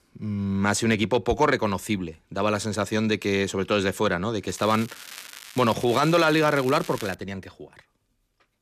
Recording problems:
crackling; noticeable; from 4.5 to 7 s; 15 dB below the speech

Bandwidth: 14.5 kHz